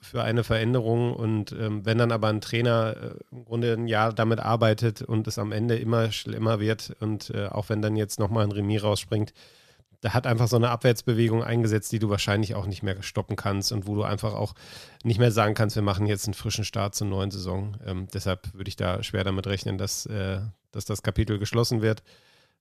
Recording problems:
none

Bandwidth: 14.5 kHz